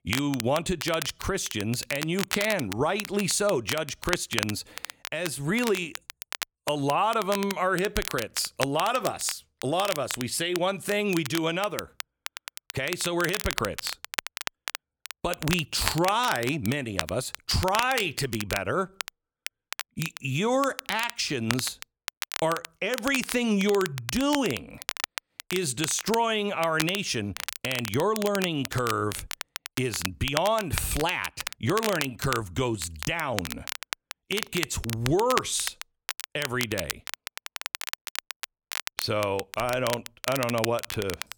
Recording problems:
crackle, like an old record; loud; 7 dB below the speech

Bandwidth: 18.5 kHz